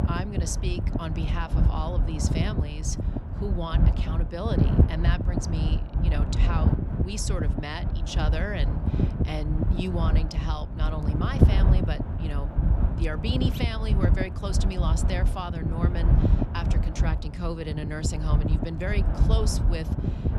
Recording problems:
wind noise on the microphone; heavy; 2 dB below the speech

